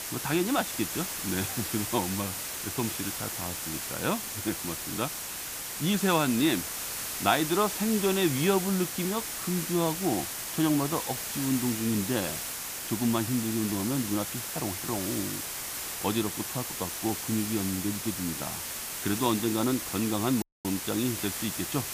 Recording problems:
hiss; loud; throughout; 3 dB below the speech
audio cutting out; at 20 s

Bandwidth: 15 kHz